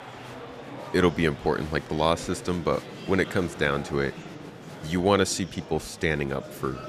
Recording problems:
murmuring crowd; noticeable; throughout; 15 dB below the speech

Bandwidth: 14.5 kHz